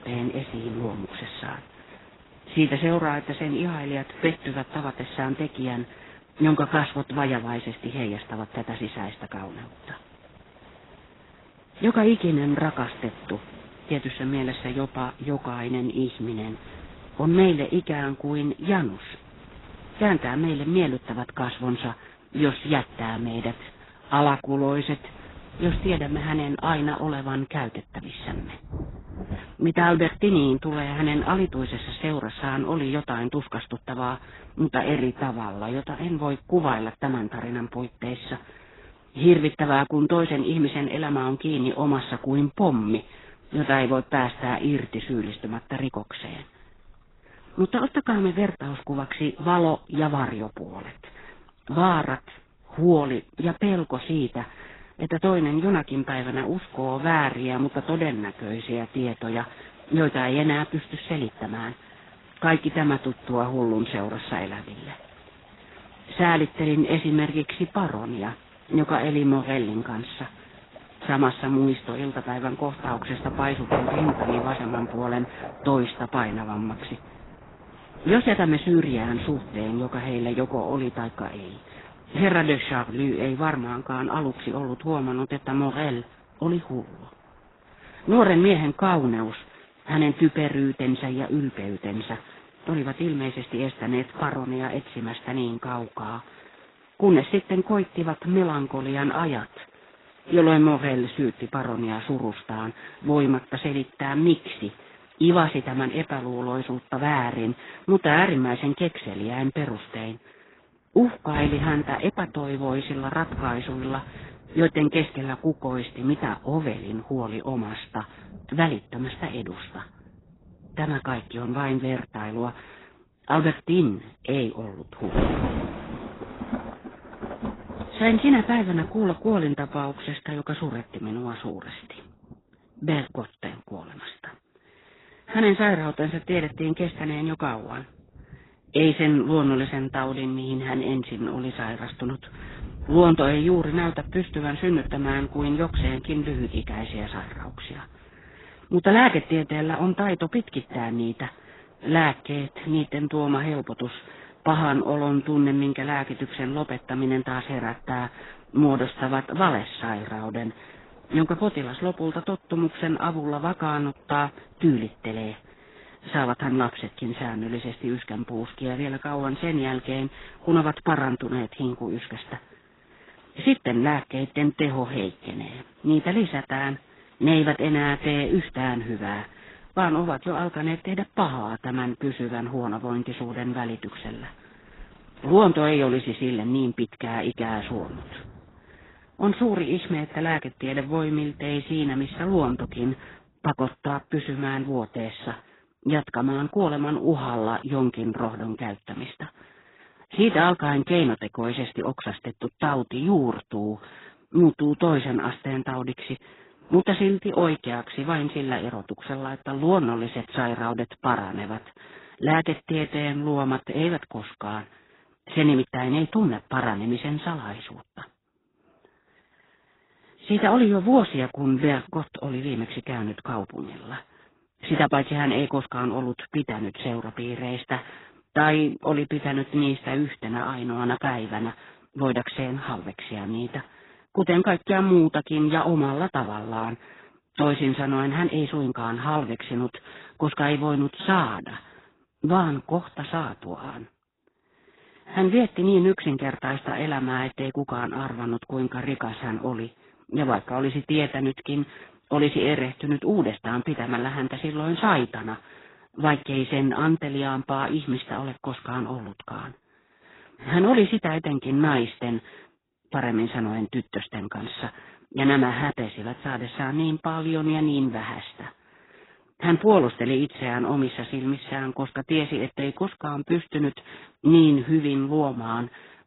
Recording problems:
garbled, watery; badly; nothing above 4 kHz
rain or running water; noticeable; until 3:13; 15 dB below the speech

